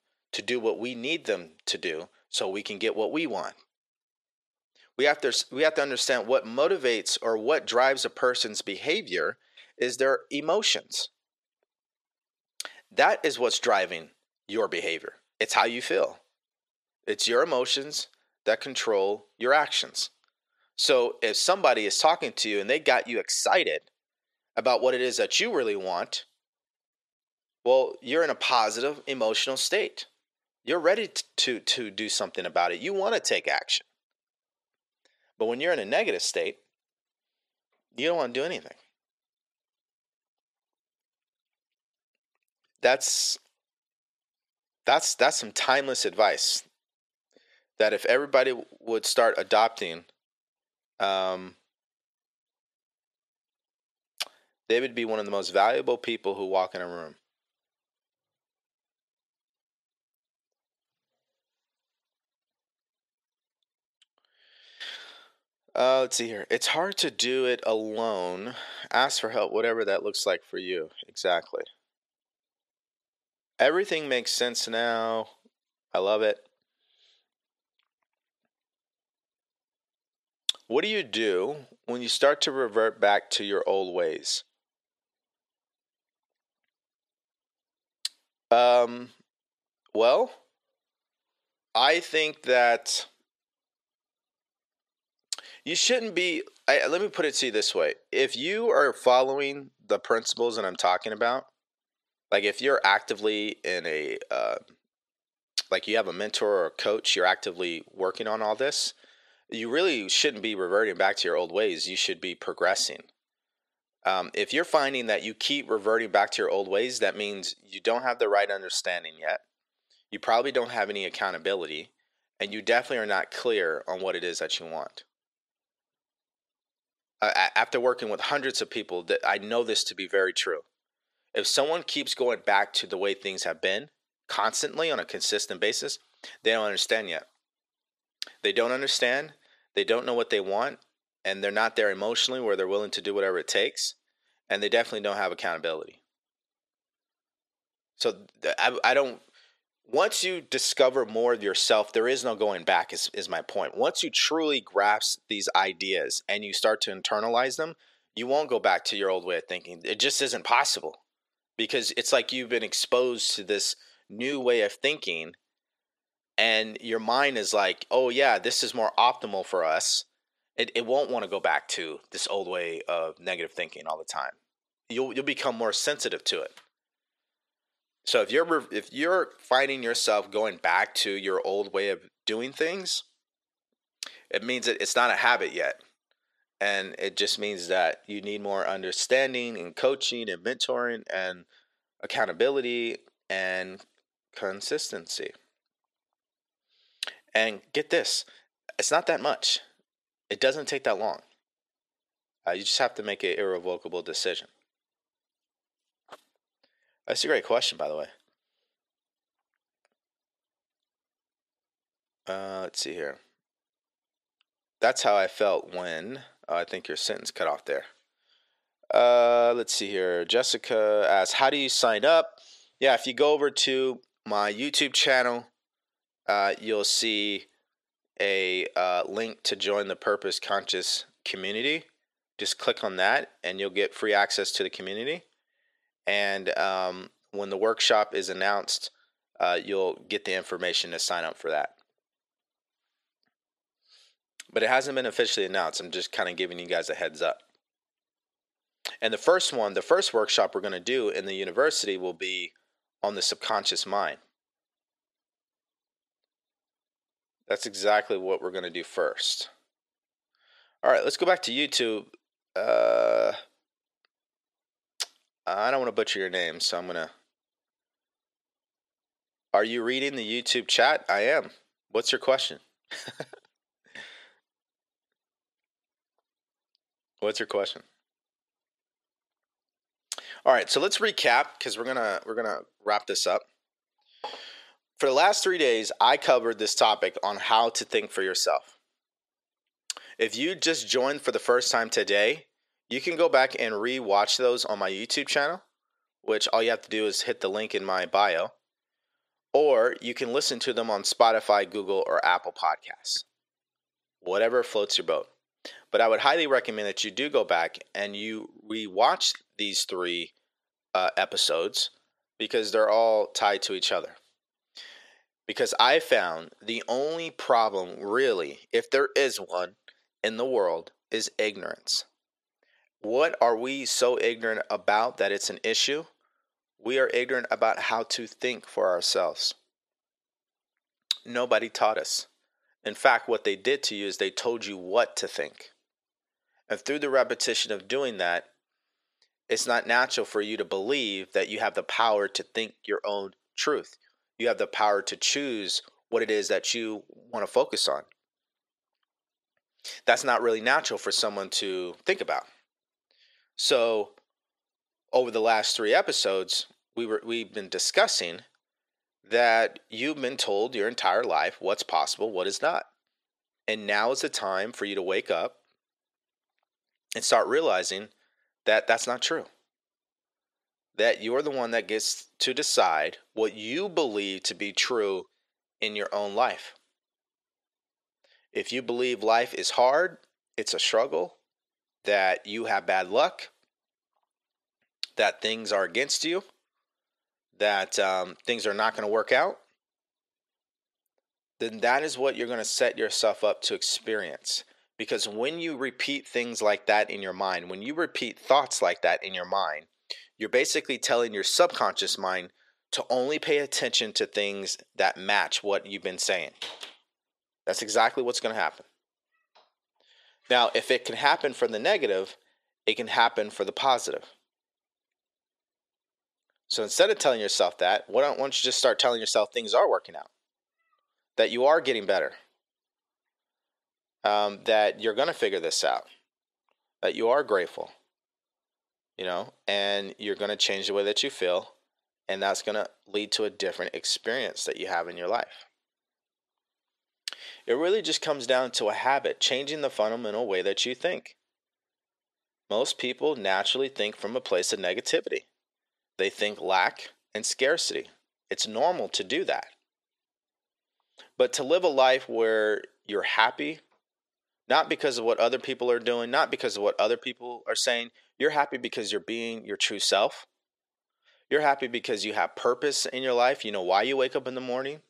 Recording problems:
thin; very; fading below 450 Hz

